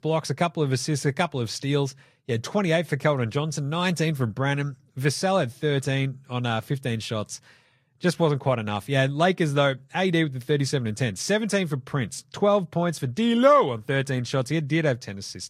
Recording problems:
garbled, watery; slightly; nothing above 13 kHz

